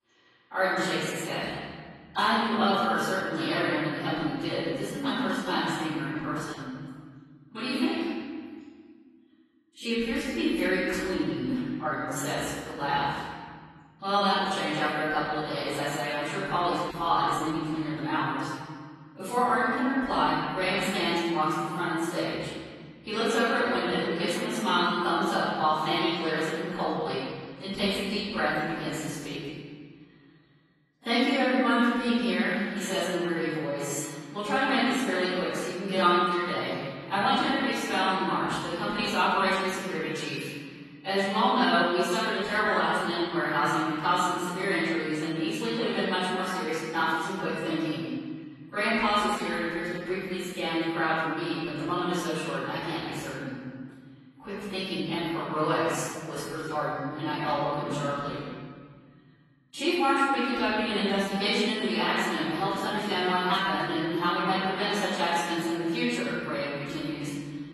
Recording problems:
room echo; strong; dies away in 2.1 s
off-mic speech; far
garbled, watery; slightly; nothing above 12.5 kHz

